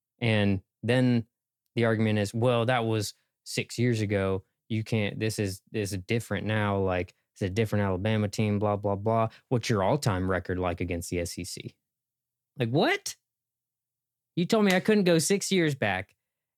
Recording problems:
none

